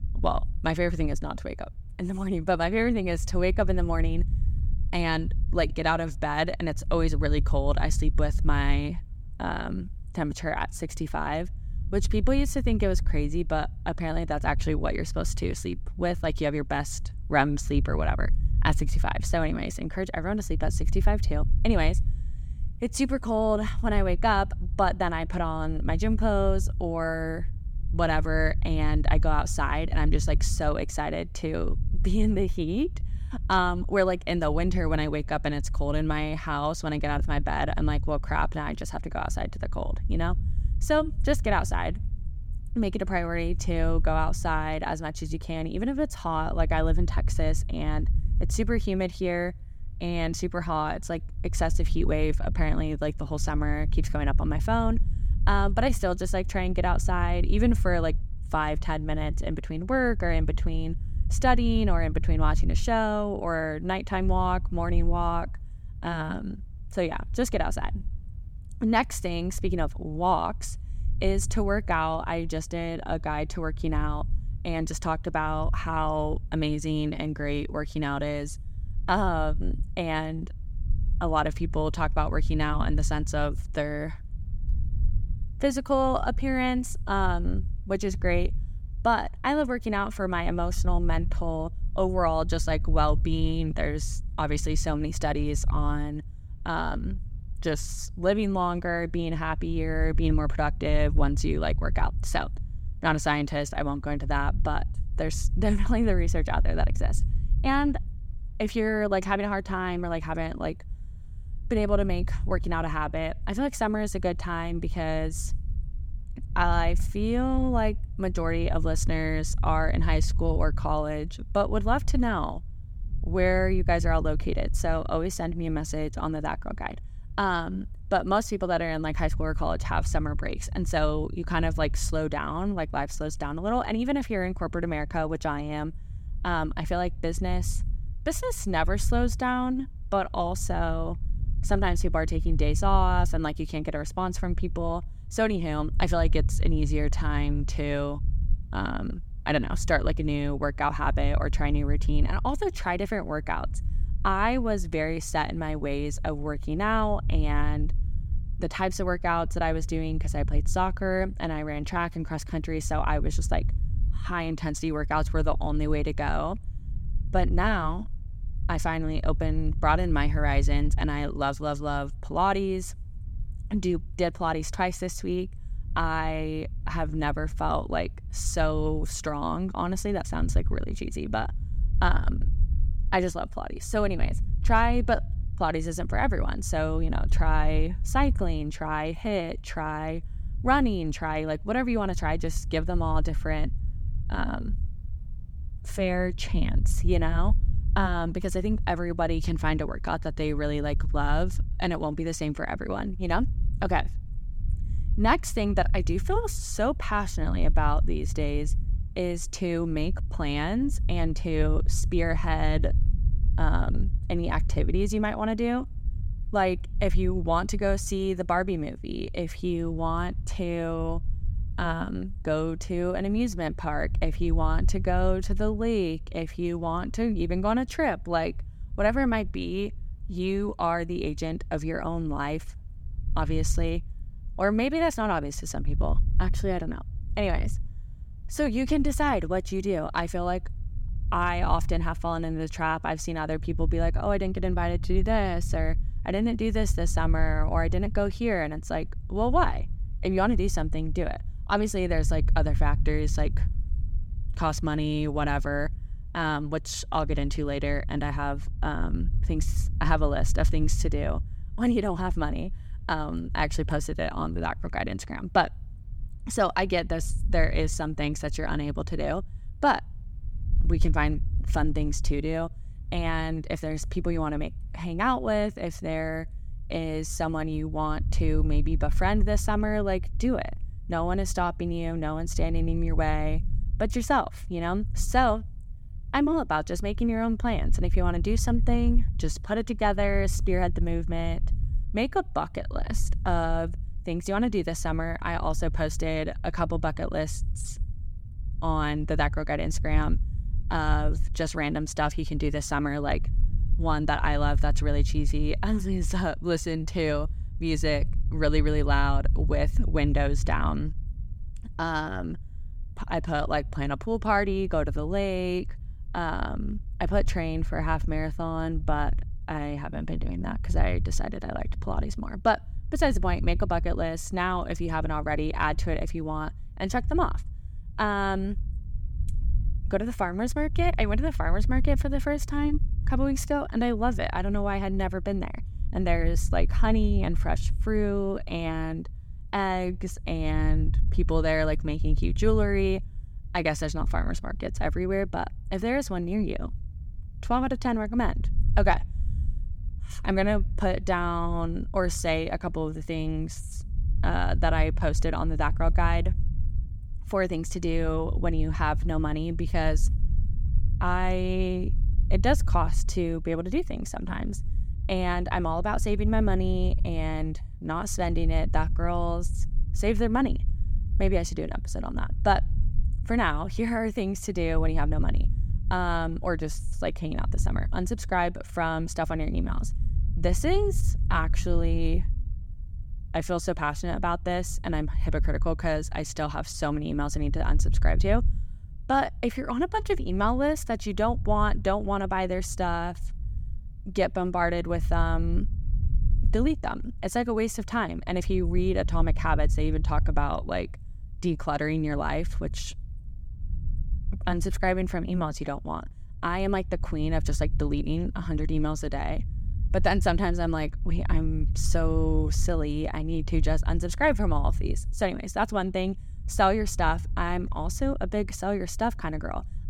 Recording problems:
low rumble; faint; throughout; 20 dB below the speech

